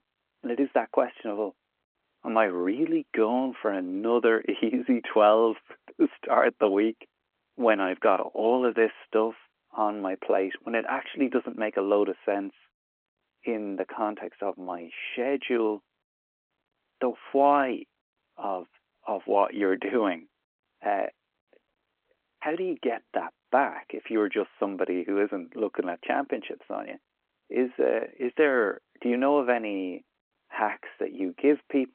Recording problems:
phone-call audio

